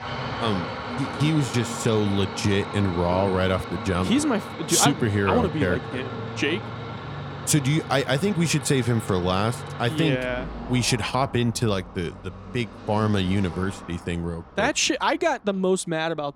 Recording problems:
traffic noise; noticeable; throughout; 10 dB below the speech

